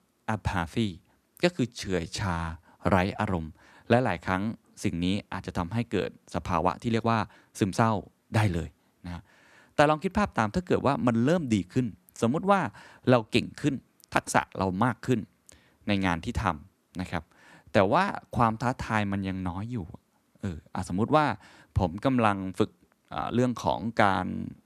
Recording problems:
uneven, jittery; strongly; from 1.5 to 24 s

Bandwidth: 14 kHz